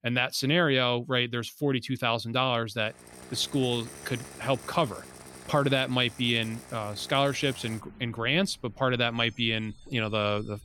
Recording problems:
traffic noise; noticeable; from 3 s on; 20 dB below the speech

